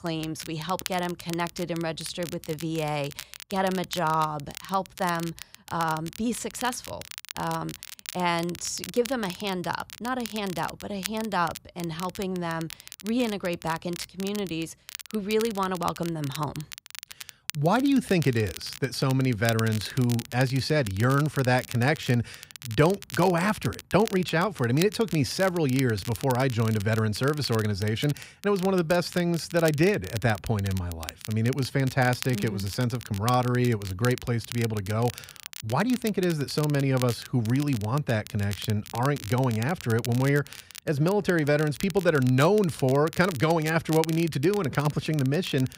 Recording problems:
crackle, like an old record; noticeable; 15 dB below the speech

